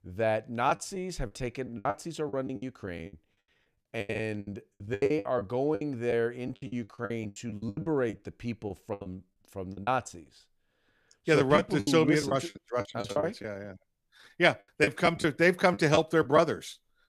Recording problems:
choppy; very; 17% of the speech affected

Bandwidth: 14.5 kHz